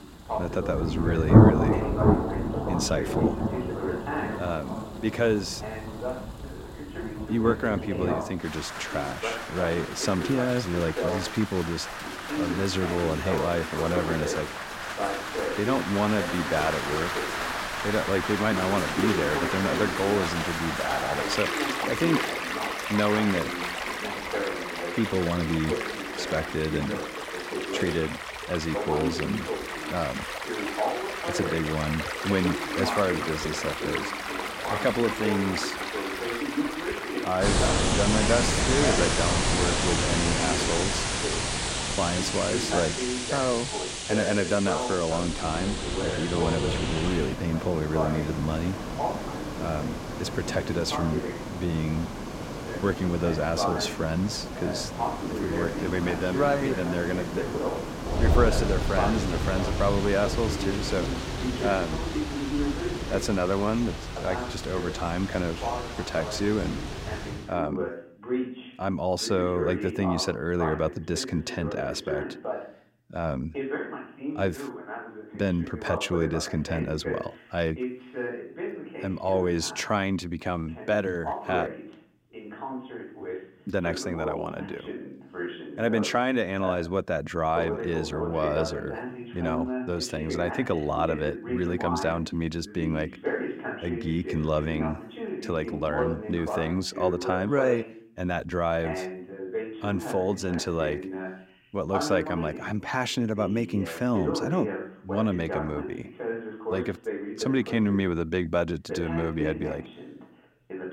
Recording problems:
rain or running water; loud; until 1:07; 1 dB below the speech
voice in the background; loud; throughout; 6 dB below the speech

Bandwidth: 16 kHz